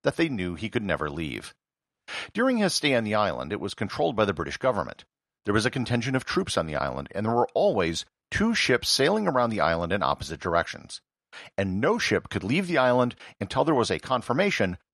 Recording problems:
none

